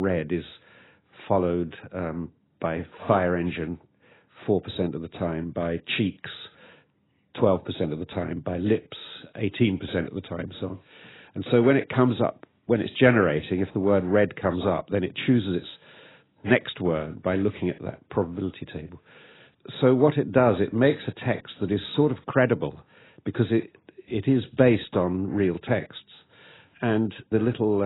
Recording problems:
garbled, watery; badly; nothing above 4 kHz
abrupt cut into speech; at the start and the end

